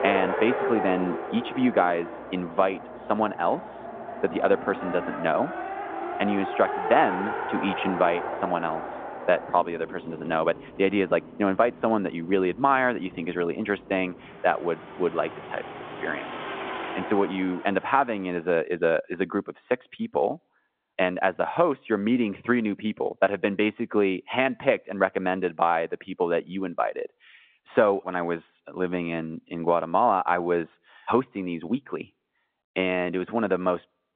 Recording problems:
phone-call audio
traffic noise; loud; until 18 s; 7 dB below the speech

